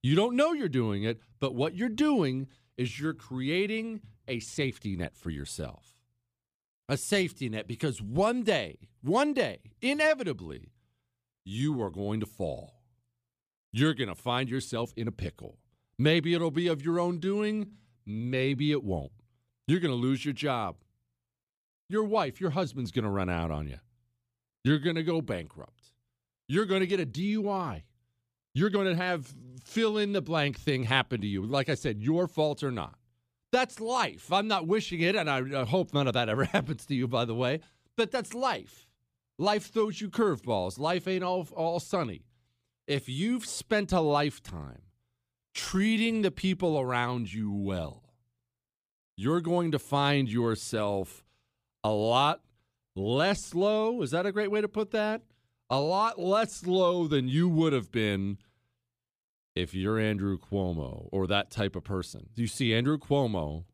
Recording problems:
uneven, jittery; strongly; from 4 s to 1:03

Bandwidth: 15 kHz